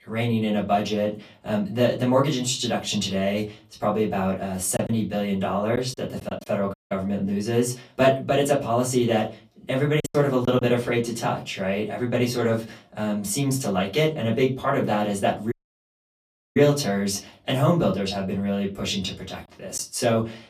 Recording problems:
off-mic speech; far
room echo; very slight; dies away in 0.3 s
choppy; very; from 5 to 6.5 s and at 10 s; 5% of the speech affected
audio cutting out; at 6.5 s and at 16 s for 1 s

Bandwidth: 14.5 kHz